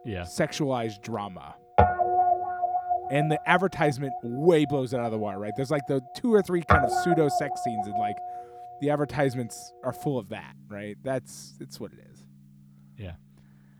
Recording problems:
background music; loud; throughout; as loud as the speech

